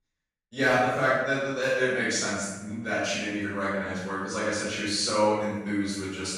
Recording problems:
room echo; strong; dies away in 0.9 s
off-mic speech; far

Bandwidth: 15.5 kHz